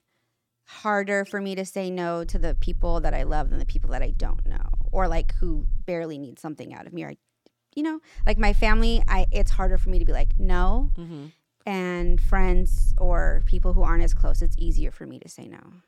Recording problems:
low rumble; faint; from 2.5 to 6 s, from 8 to 11 s and from 12 to 15 s; 25 dB below the speech

